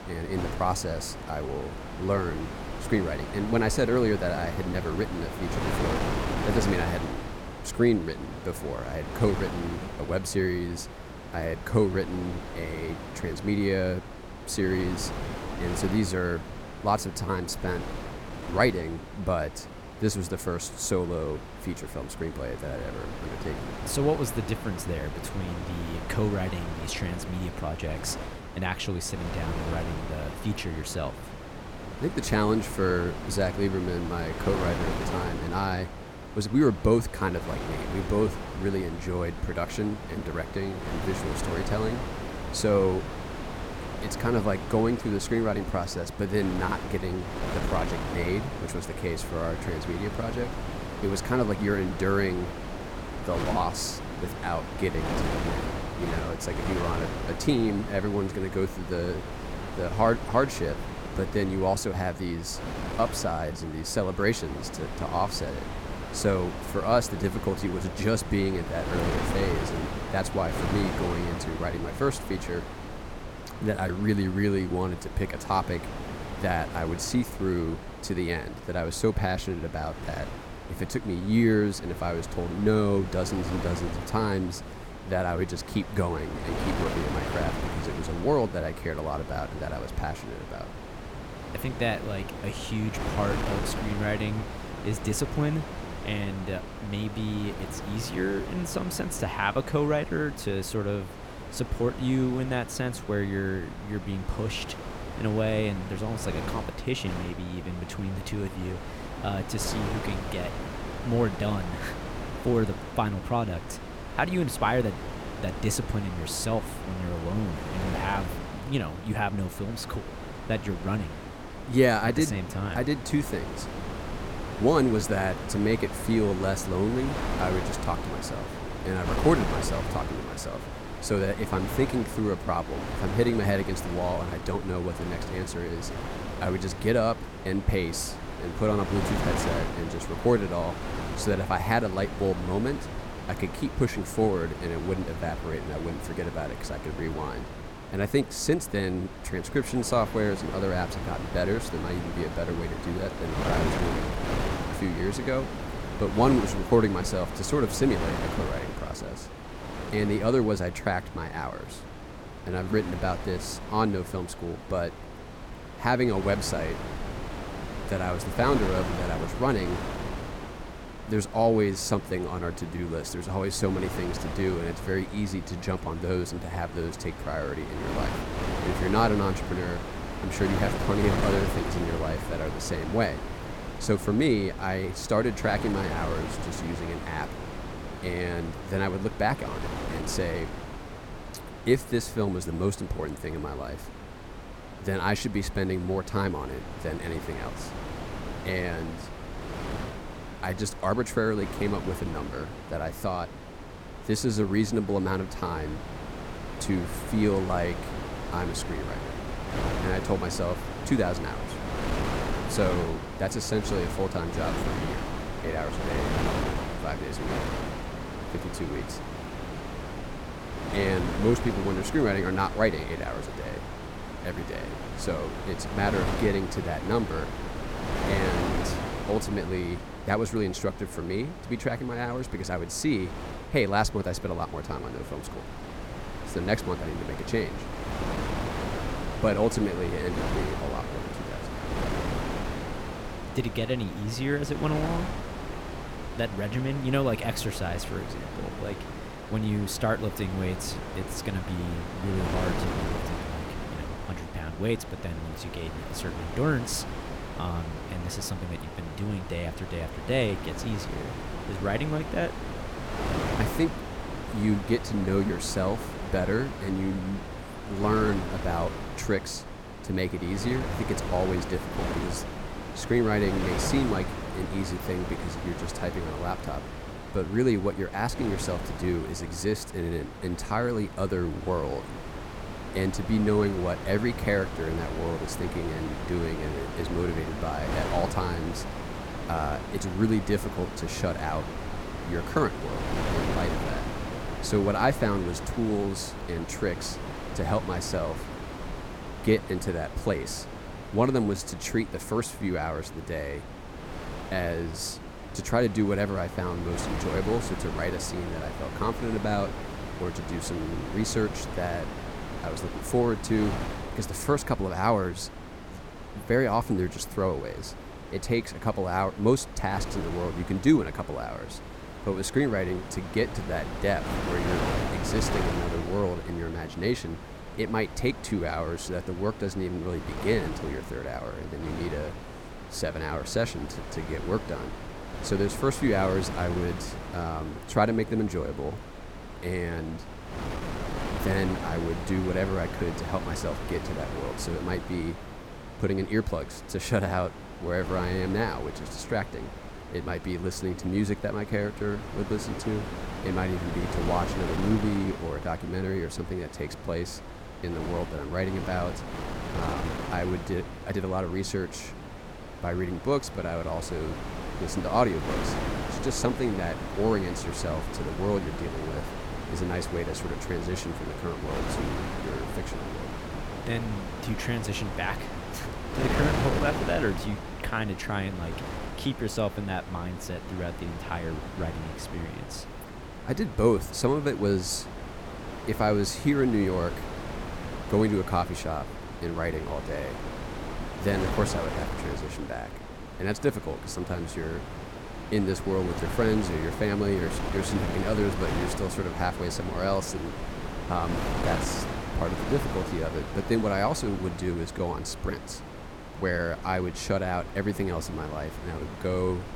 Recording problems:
wind noise on the microphone; heavy; 6 dB below the speech

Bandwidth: 17 kHz